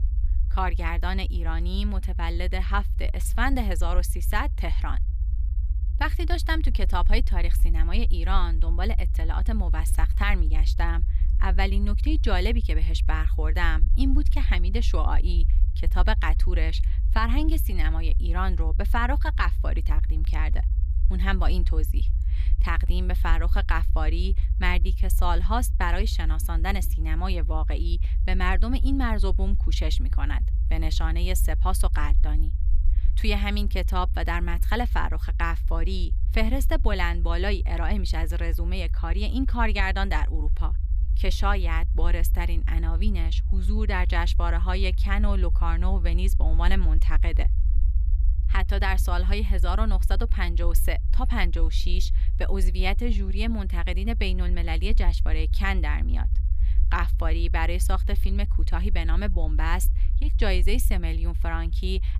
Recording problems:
low rumble; noticeable; throughout; 15 dB below the speech

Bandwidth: 14.5 kHz